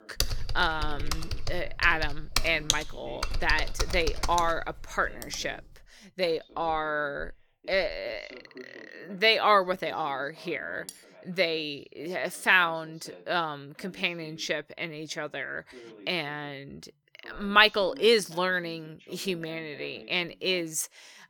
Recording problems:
voice in the background; faint; throughout; 25 dB below the speech
keyboard typing; loud; until 5.5 s; peak 1 dB above the speech
clattering dishes; faint; at 11 s; peak 15 dB below the speech

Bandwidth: 18.5 kHz